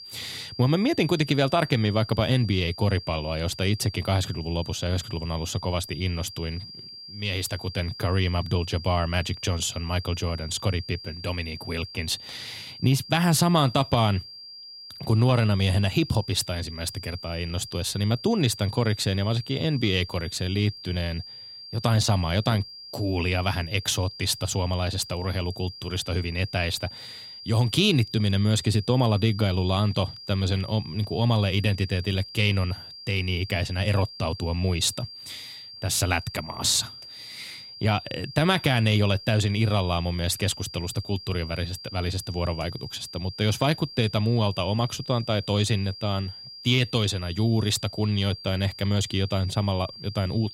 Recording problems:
high-pitched whine; noticeable; throughout; 4.5 kHz, 15 dB below the speech

